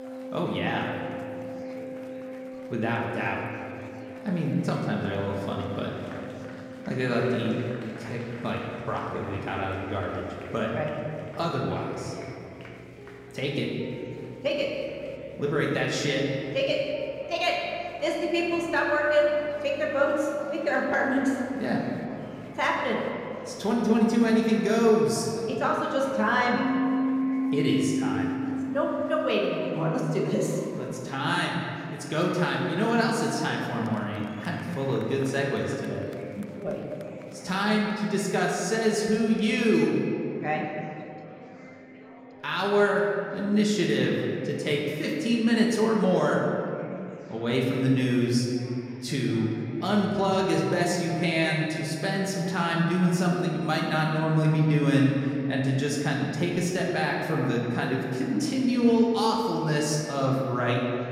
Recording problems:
room echo; noticeable; dies away in 2.3 s
off-mic speech; somewhat distant
background music; noticeable; until 44 s; 10 dB below the speech
murmuring crowd; faint; throughout; 20 dB below the speech

